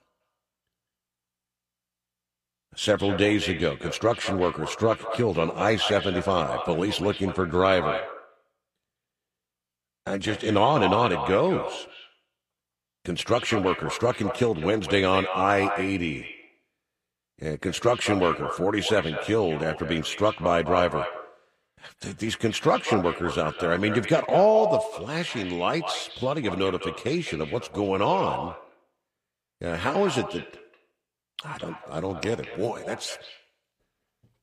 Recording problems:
echo of what is said; strong; throughout; 200 ms later, 9 dB below the speech

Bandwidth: 15 kHz